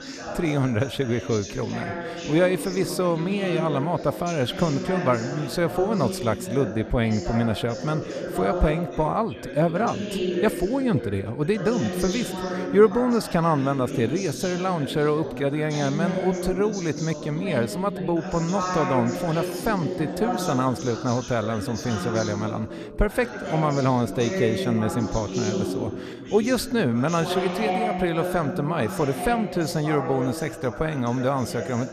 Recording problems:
background chatter; loud; throughout; 4 voices, 6 dB below the speech

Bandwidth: 14.5 kHz